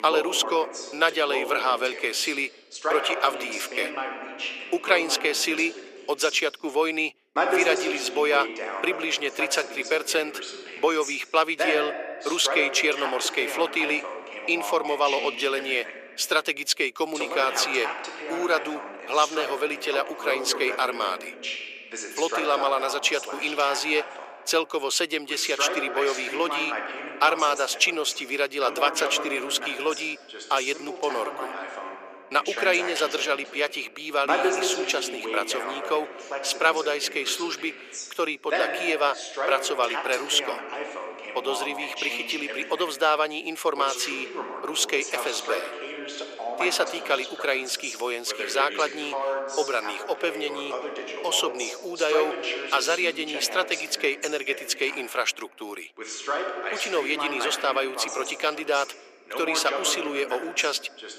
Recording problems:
thin; very; fading below 350 Hz
voice in the background; loud; throughout; 7 dB below the speech

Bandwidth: 14.5 kHz